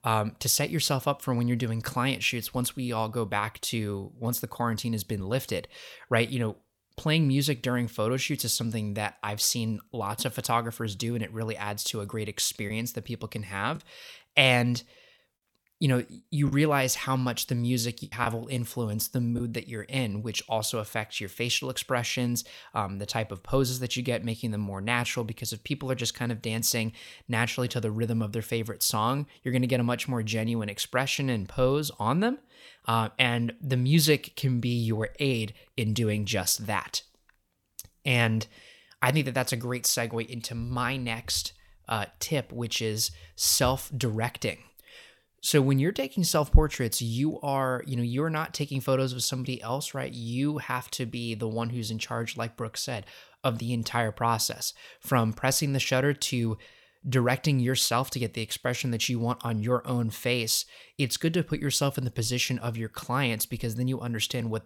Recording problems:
choppy; very; from 13 to 17 s and from 18 to 19 s; 5% of the speech affected

